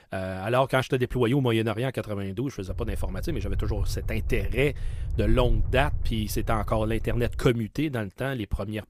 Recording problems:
low rumble; faint; from 2.5 to 7.5 s; 20 dB below the speech

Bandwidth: 15 kHz